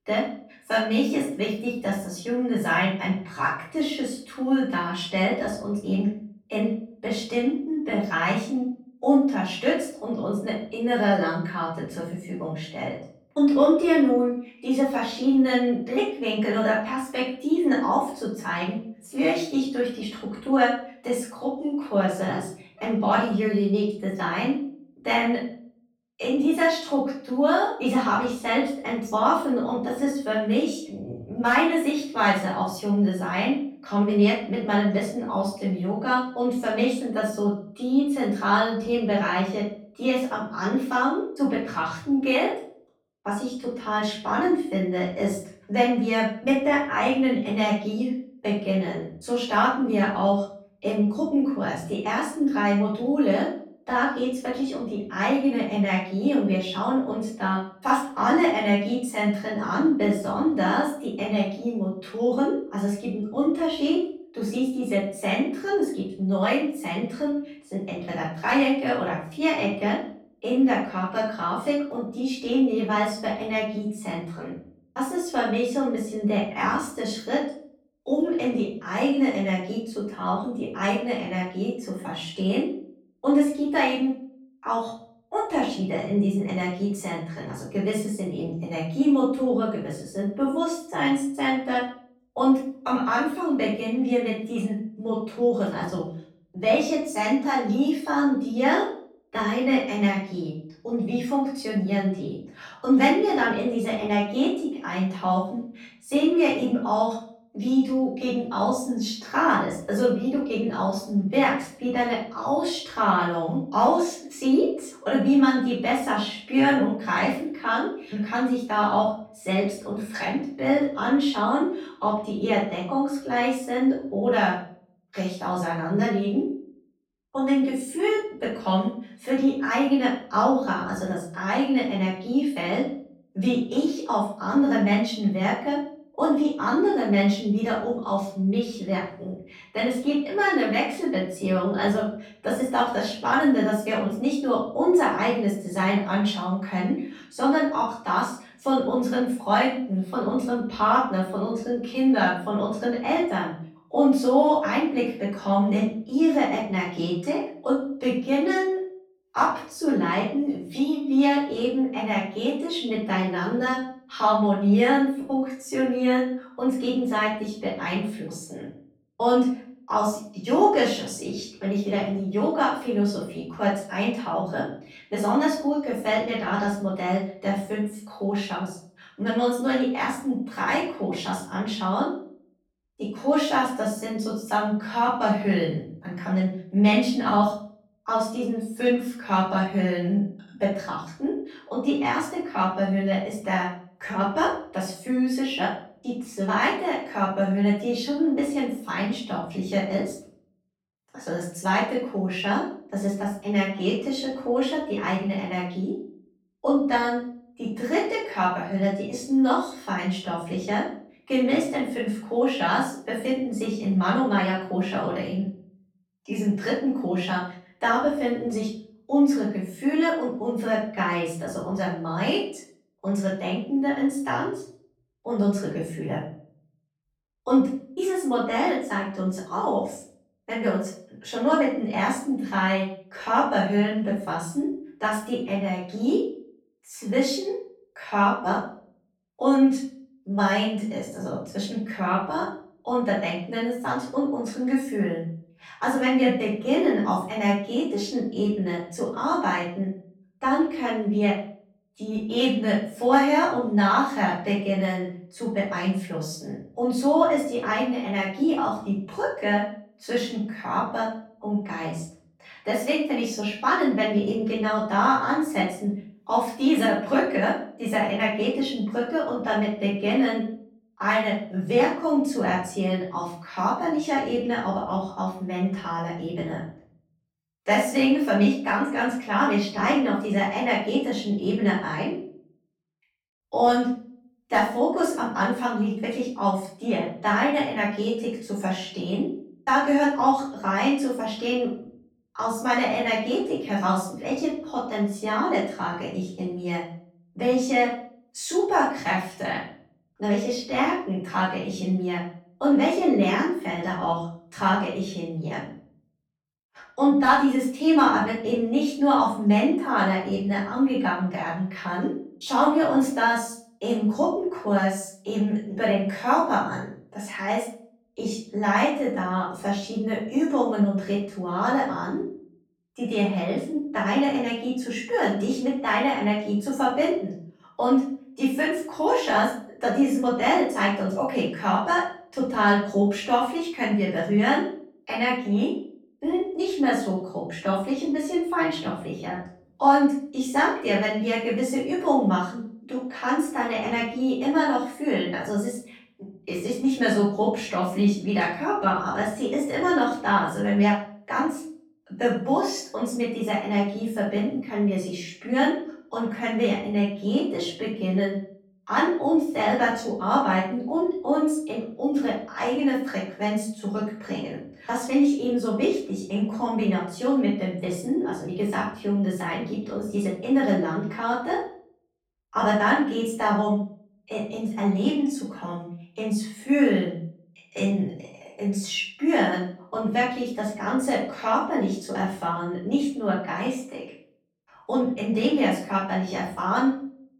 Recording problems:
off-mic speech; far
room echo; noticeable; dies away in 0.5 s

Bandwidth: 18 kHz